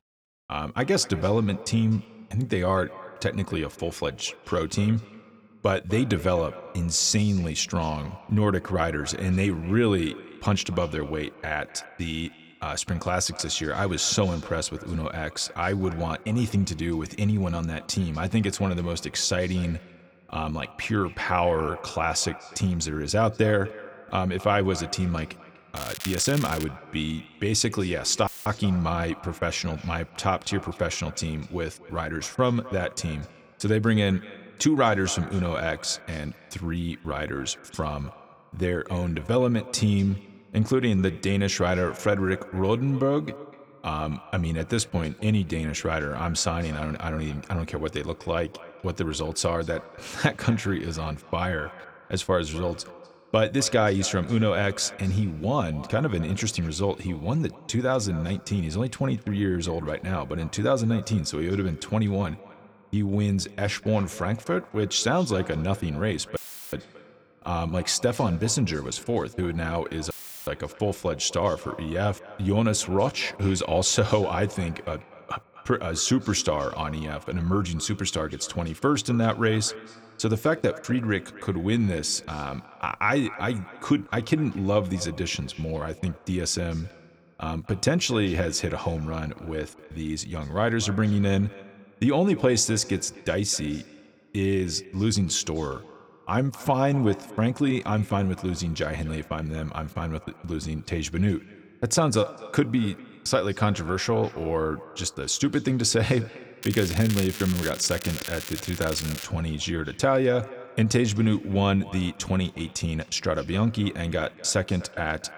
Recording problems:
echo of what is said; faint; throughout; 250 ms later, 20 dB below the speech
crackling; loud; at 26 s and from 1:47 to 1:49; 9 dB below the speech
audio cutting out; filled with static; at 28 s, at 1:06 and at 1:10

